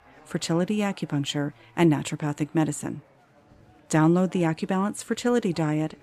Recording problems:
chatter from many people; faint; throughout; 30 dB below the speech

